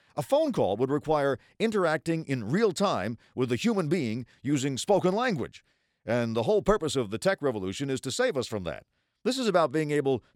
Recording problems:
none

